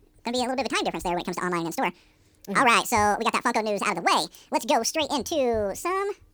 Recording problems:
wrong speed and pitch; too fast and too high; 1.7 times normal speed

